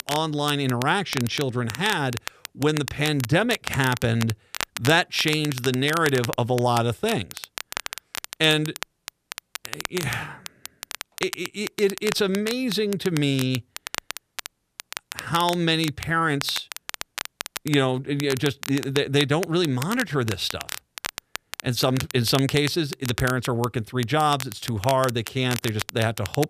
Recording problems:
crackle, like an old record; noticeable; 10 dB below the speech

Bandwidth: 14.5 kHz